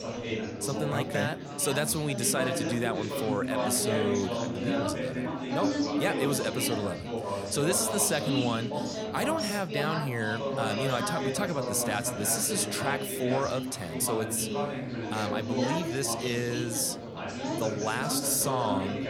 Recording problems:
chatter from many people; loud; throughout; 2 dB below the speech

